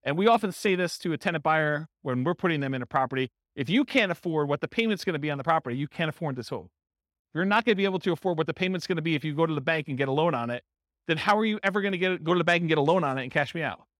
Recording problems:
none

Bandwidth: 16 kHz